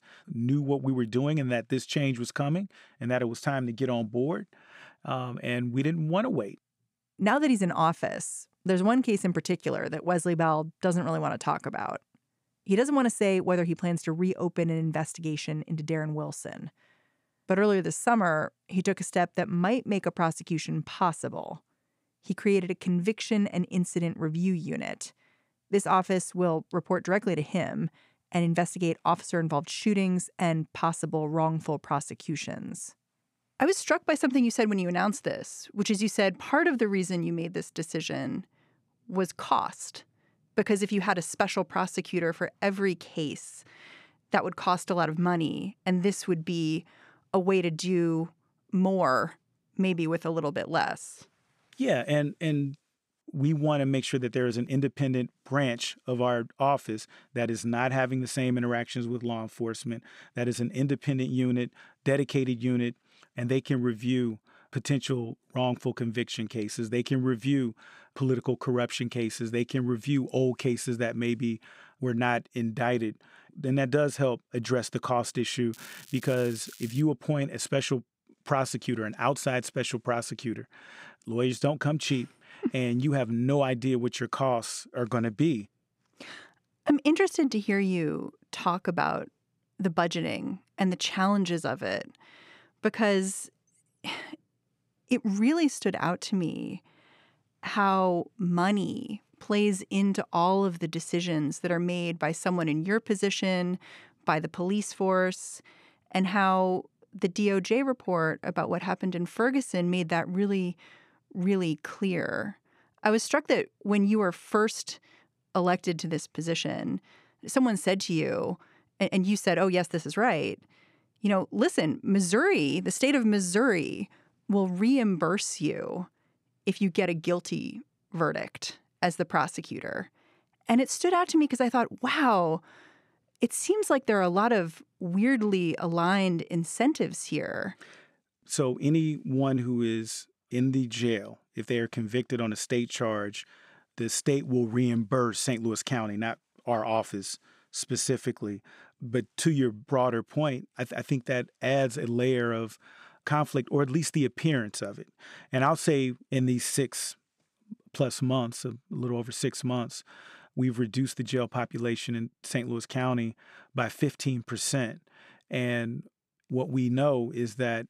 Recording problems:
crackling; noticeable; from 1:16 to 1:17; 20 dB below the speech

